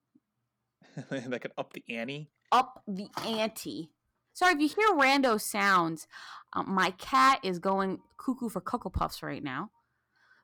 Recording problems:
distortion; slight; 1.7% of the sound clipped

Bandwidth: 18.5 kHz